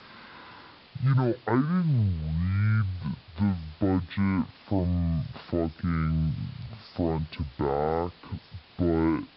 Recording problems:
wrong speed and pitch; too slow and too low; 0.5 times normal speed
high frequencies cut off; noticeable; nothing above 5 kHz
hiss; faint; throughout; 25 dB below the speech

